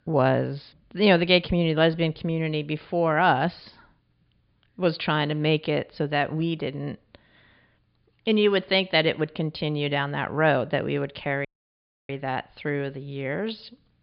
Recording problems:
high frequencies cut off; severe; nothing above 5 kHz
audio cutting out; at 11 s for 0.5 s

